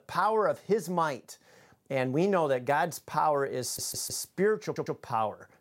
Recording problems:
audio stuttering; at 3.5 s and at 4.5 s

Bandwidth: 16 kHz